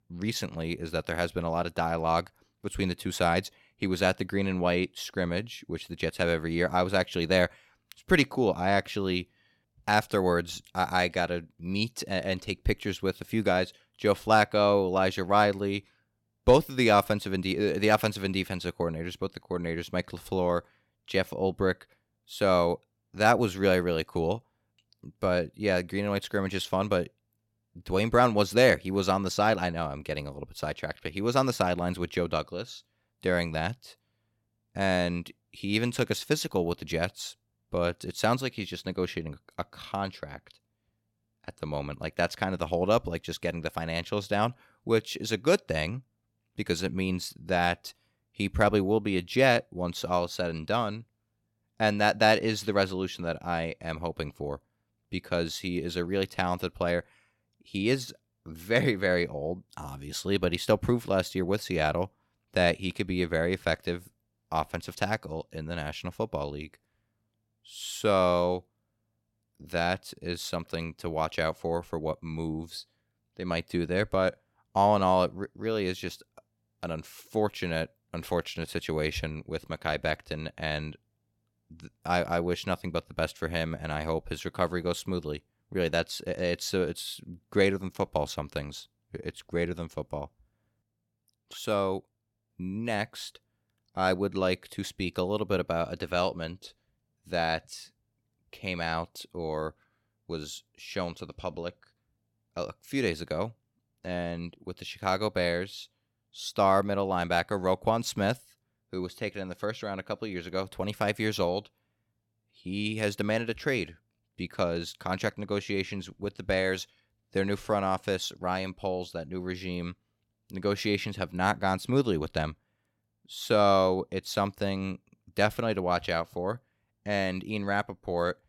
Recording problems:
none

